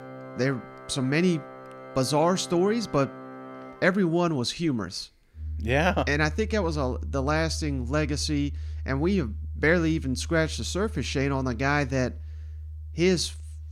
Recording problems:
background music; noticeable; throughout; 10 dB below the speech

